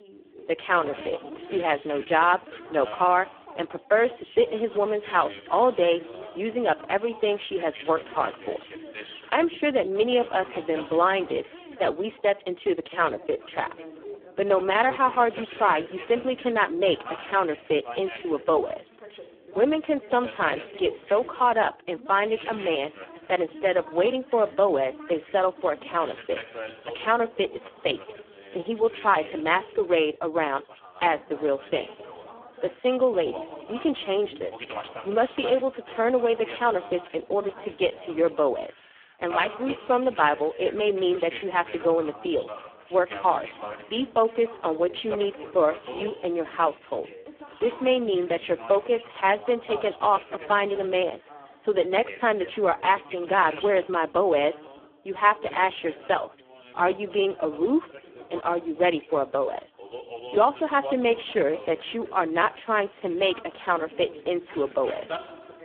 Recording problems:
phone-call audio; poor line
background chatter; noticeable; throughout; 2 voices, 15 dB below the speech

